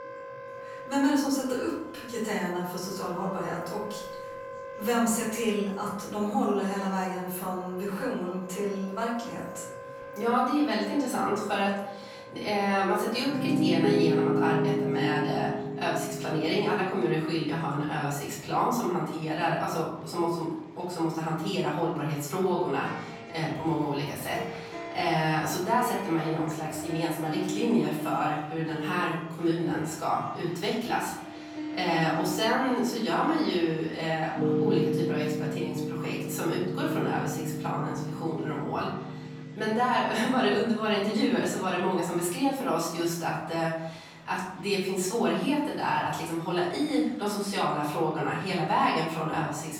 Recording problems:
off-mic speech; far
room echo; noticeable; dies away in 0.8 s
background music; loud; throughout; 6 dB below the speech
murmuring crowd; faint; throughout; 25 dB below the speech

